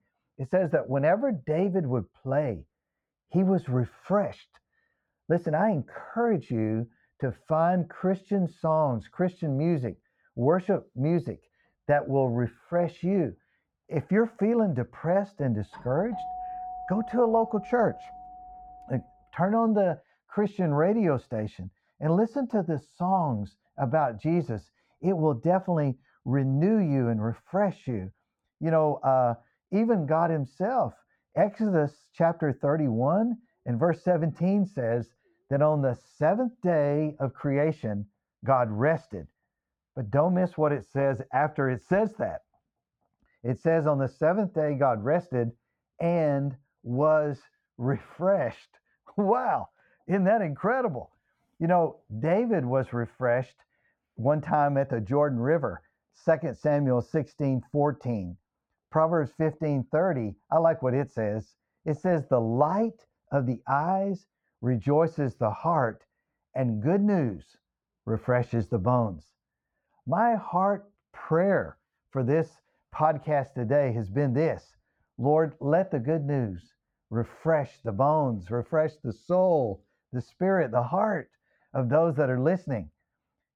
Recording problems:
muffled; very; fading above 3 kHz
doorbell; noticeable; from 16 to 19 s; peak 9 dB below the speech

